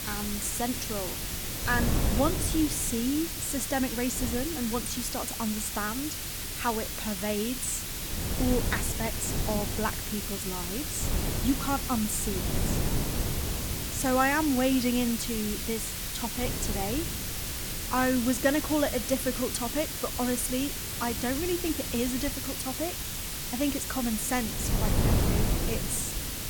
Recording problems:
hiss; loud; throughout; 2 dB below the speech
wind noise on the microphone; occasional gusts; 10 dB below the speech

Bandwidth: 18.5 kHz